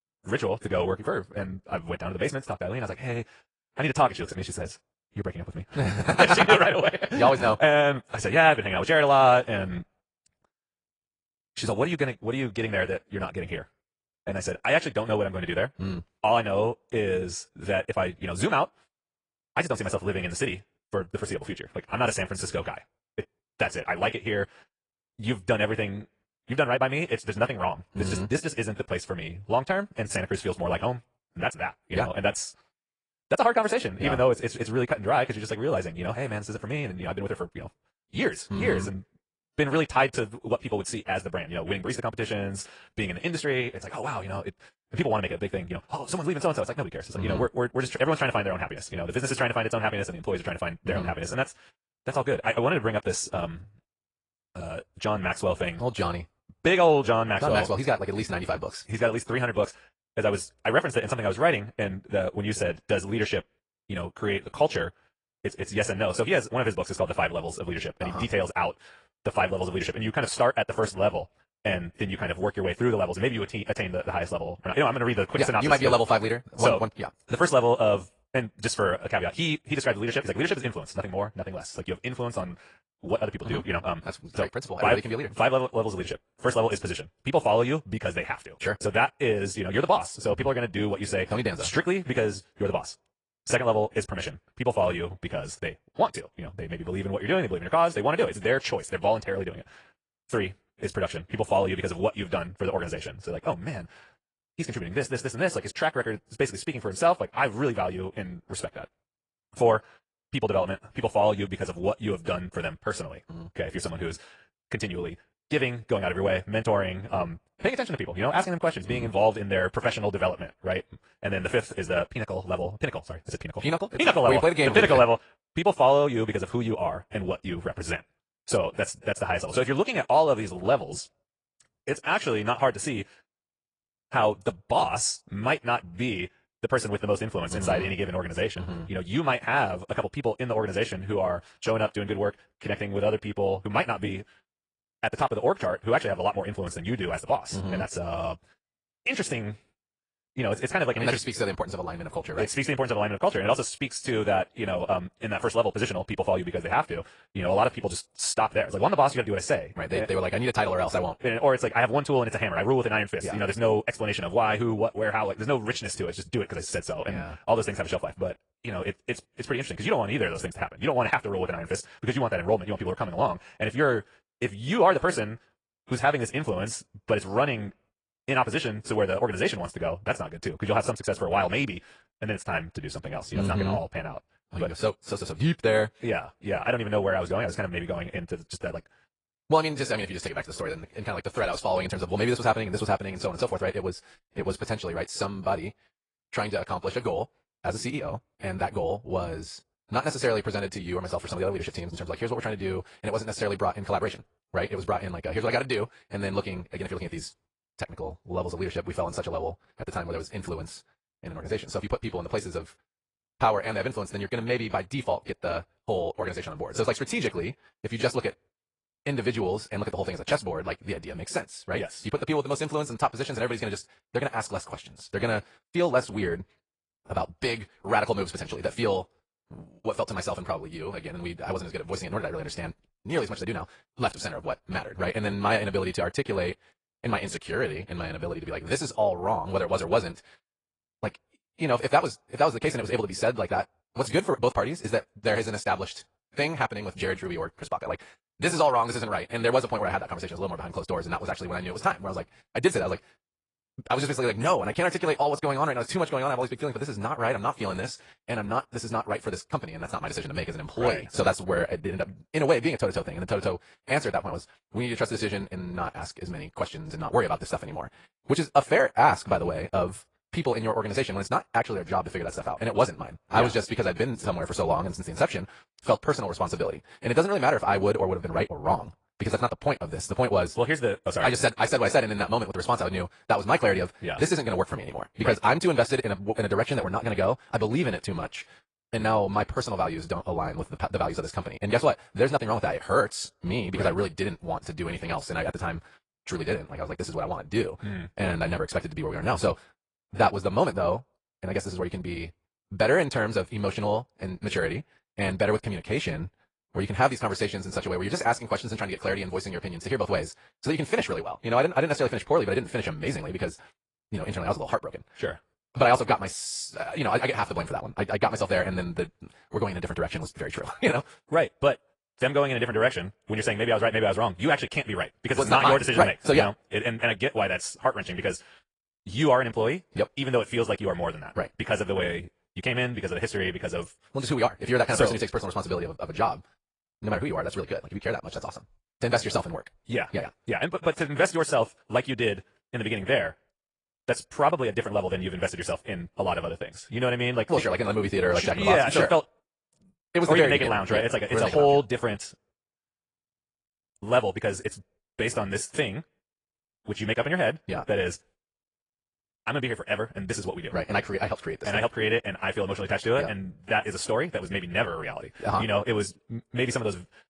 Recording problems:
wrong speed, natural pitch; too fast; 1.7 times normal speed
garbled, watery; slightly; nothing above 10 kHz

